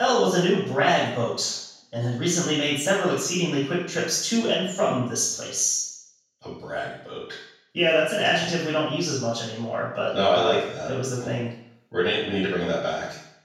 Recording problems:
room echo; strong; dies away in 0.7 s
off-mic speech; far
abrupt cut into speech; at the start

